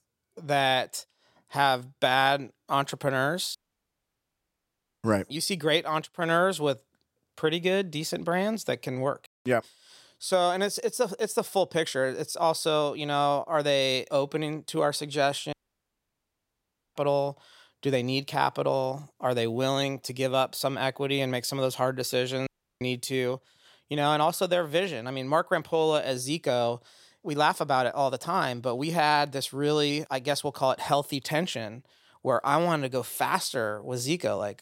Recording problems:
audio cutting out; at 3.5 s for 1.5 s, at 16 s for 1.5 s and at 22 s

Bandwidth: 16 kHz